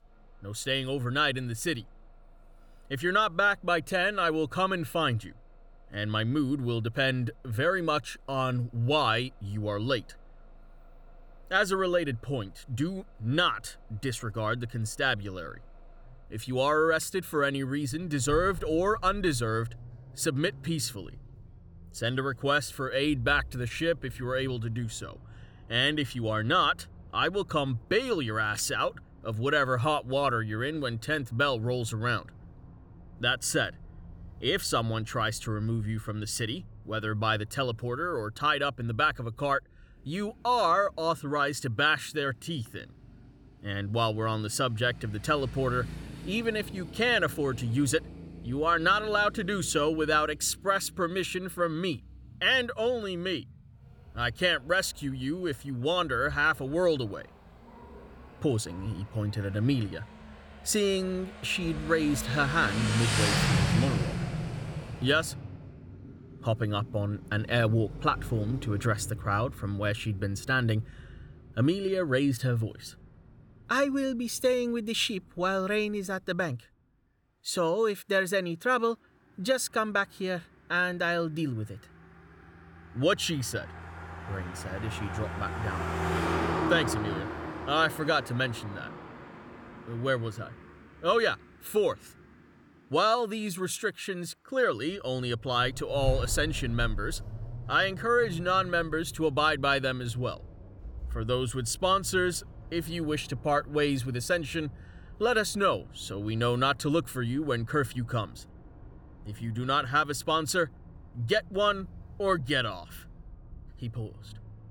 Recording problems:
traffic noise; noticeable; throughout; 10 dB below the speech

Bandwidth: 18.5 kHz